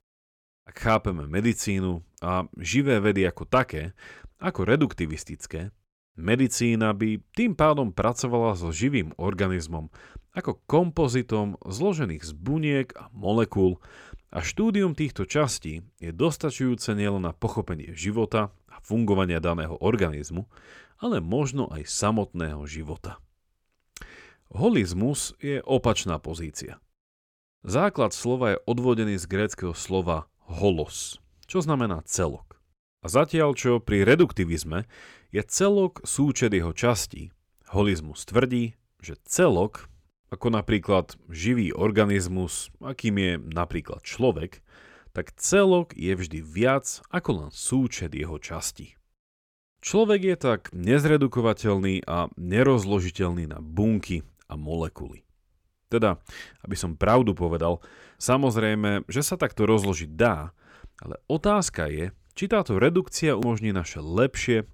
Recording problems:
none

